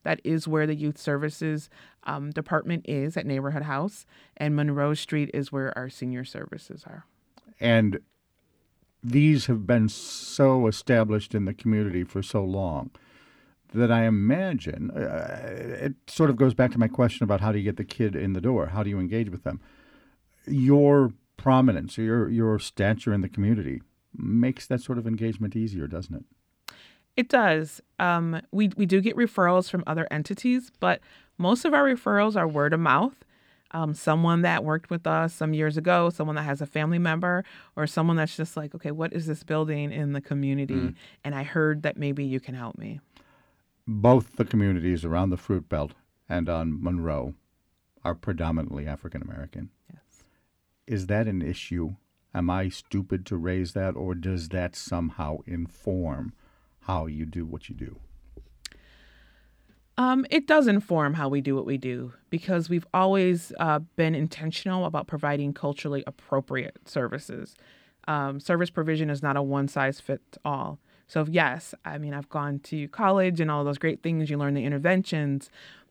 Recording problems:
none

